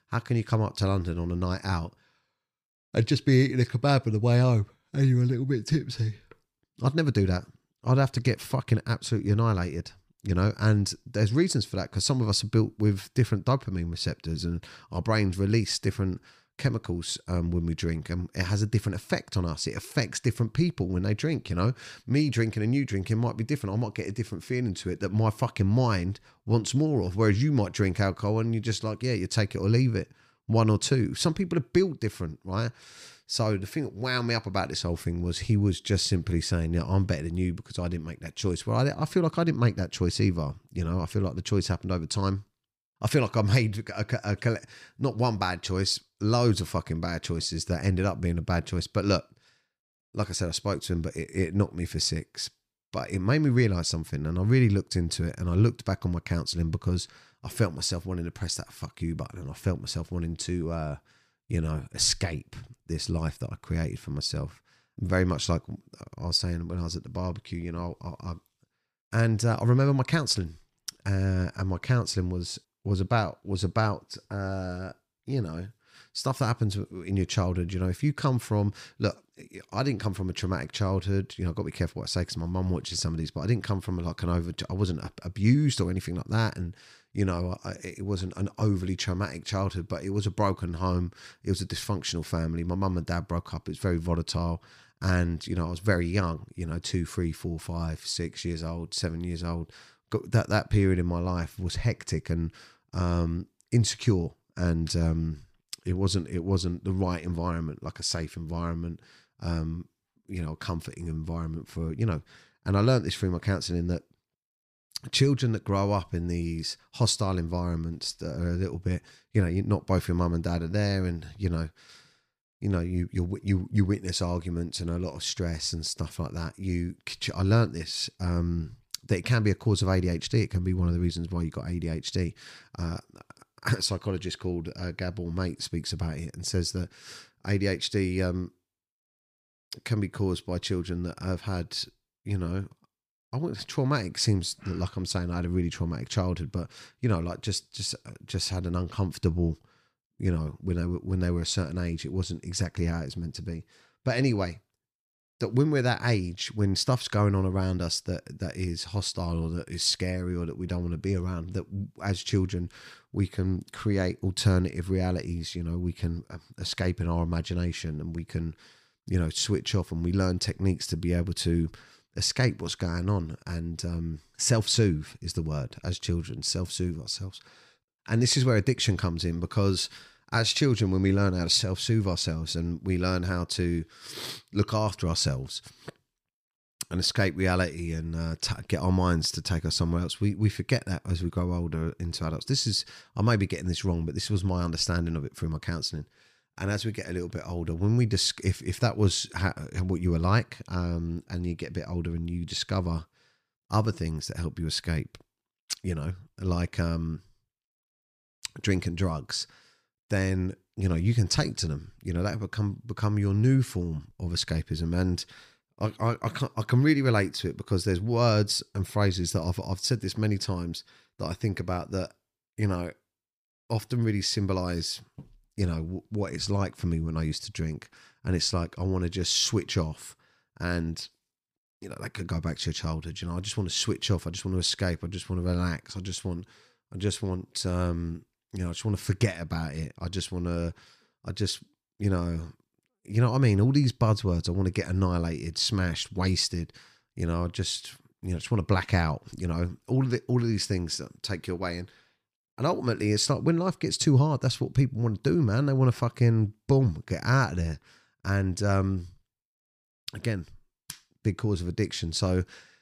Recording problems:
none

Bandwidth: 15 kHz